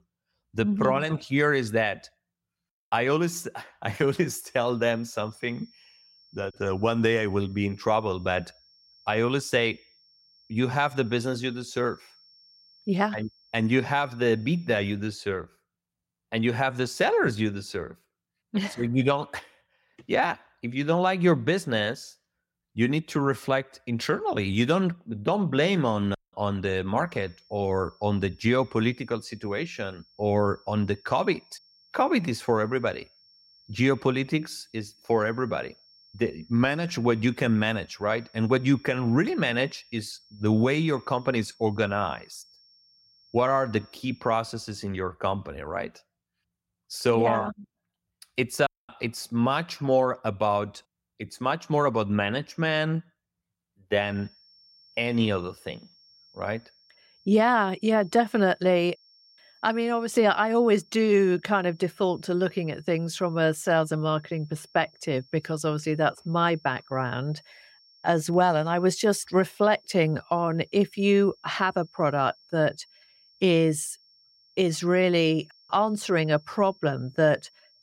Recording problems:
high-pitched whine; faint; from 4 to 15 s, from 27 to 44 s and from 54 s on; 5.5 kHz, 30 dB below the speech

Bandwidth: 16 kHz